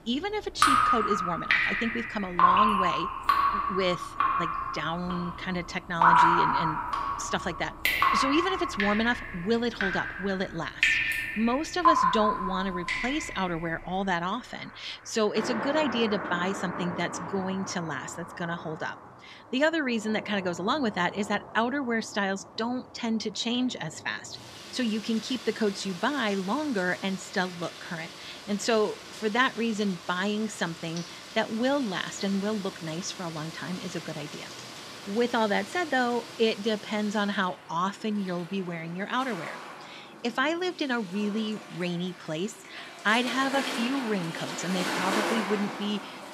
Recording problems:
rain or running water; very loud; throughout; 1 dB above the speech

